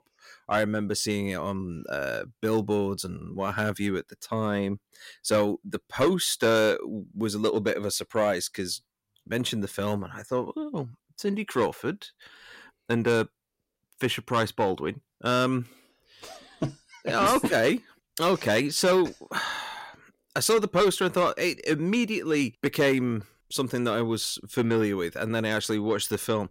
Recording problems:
distortion; slight; 10 dB below the speech

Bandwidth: 16 kHz